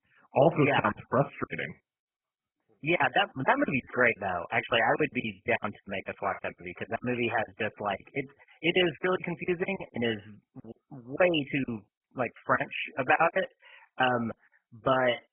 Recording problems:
garbled, watery; badly; nothing above 3 kHz
choppy; very; 19% of the speech affected

